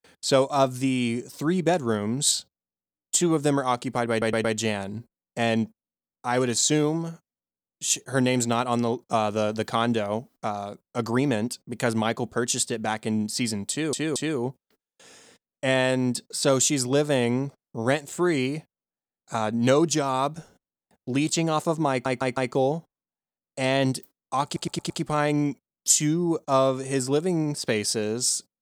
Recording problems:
audio stuttering; 4 times, first at 4 s

